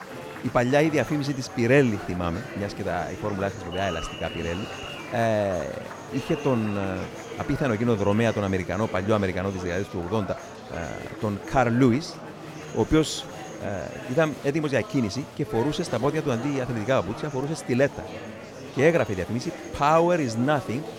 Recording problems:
murmuring crowd; noticeable; throughout; 10 dB below the speech

